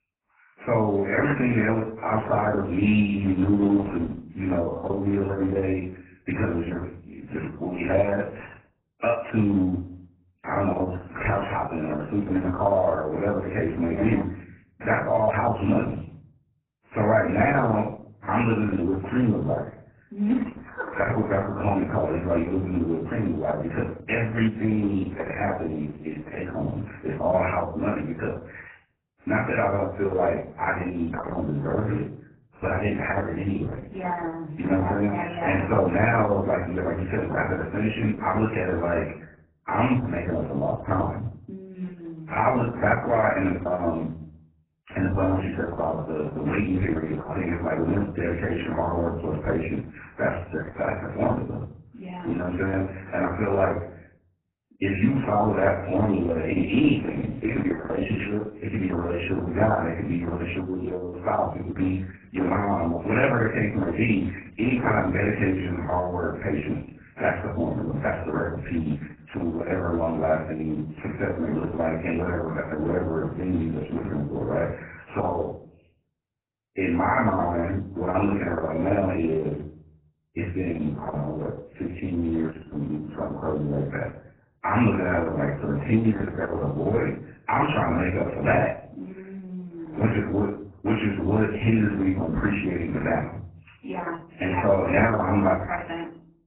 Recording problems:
off-mic speech; far
garbled, watery; badly
room echo; slight; dies away in 0.4 s

